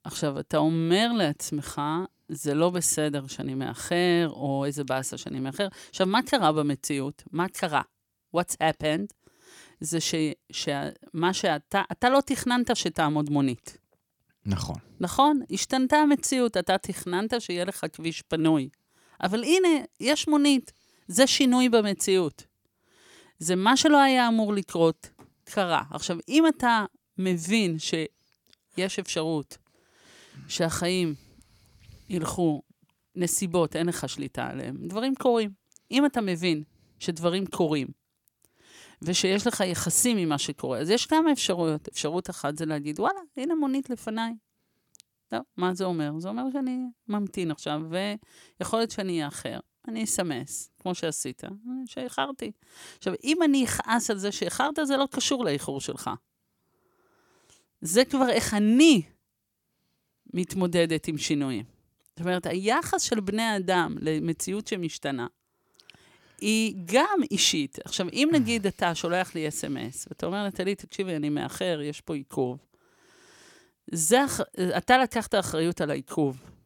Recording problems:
none

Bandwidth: 18 kHz